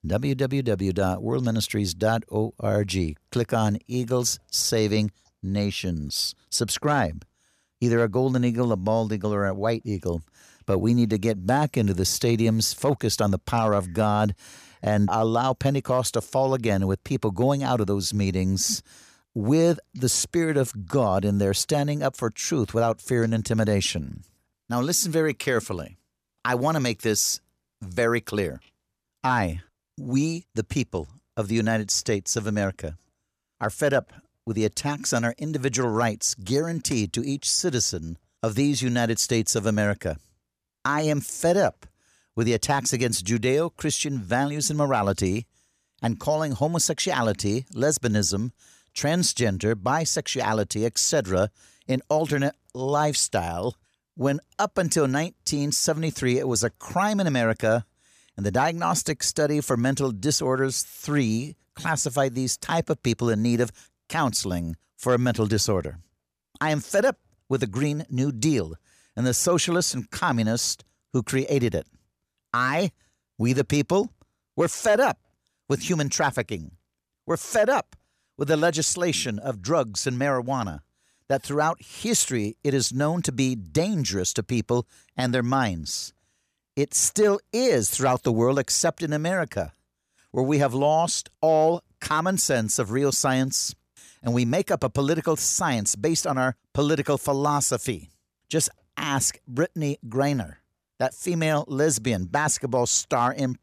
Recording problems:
none

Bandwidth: 14.5 kHz